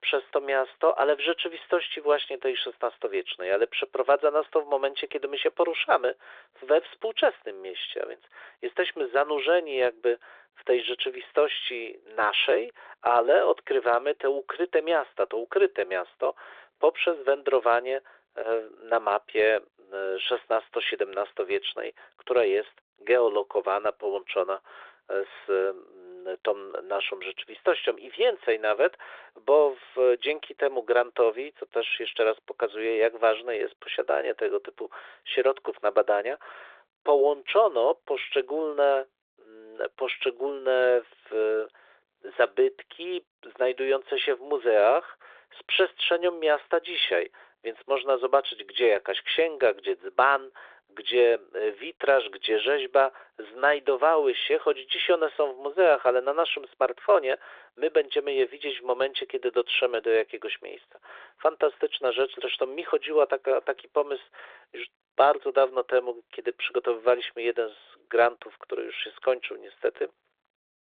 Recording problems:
phone-call audio; nothing above 3.5 kHz

